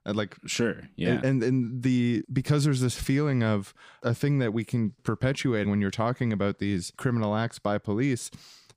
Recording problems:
none

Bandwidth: 15 kHz